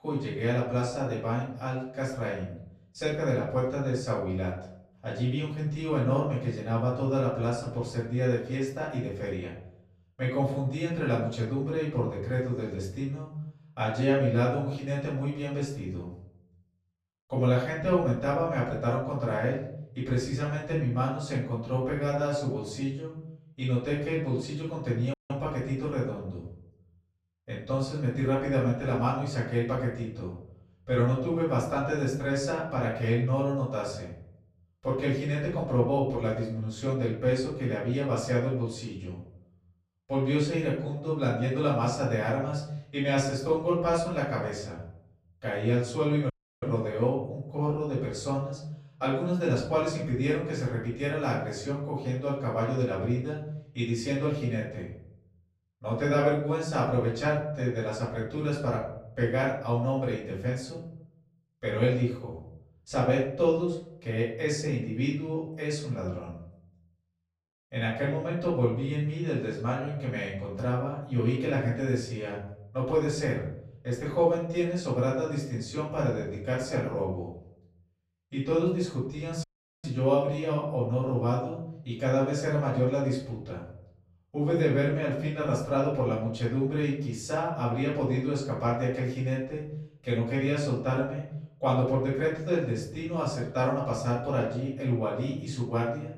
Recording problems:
off-mic speech; far
room echo; noticeable; dies away in 0.7 s
audio cutting out; at 25 s, at 46 s and at 1:19

